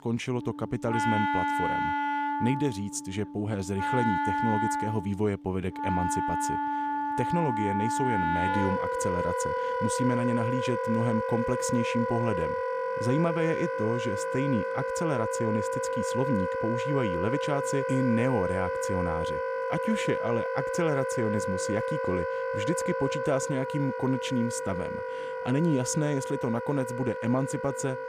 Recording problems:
background music; very loud; throughout; as loud as the speech

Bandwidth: 15 kHz